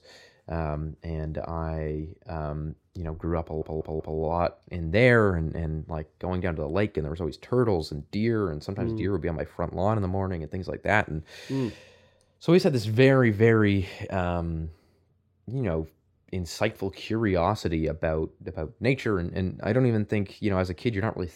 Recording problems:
audio stuttering; at 3.5 s

